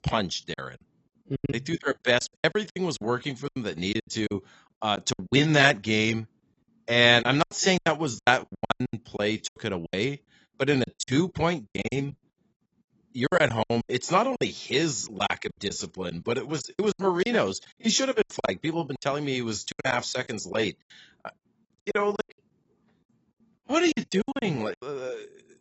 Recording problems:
garbled, watery; badly; nothing above 7.5 kHz
choppy; very; 17% of the speech affected

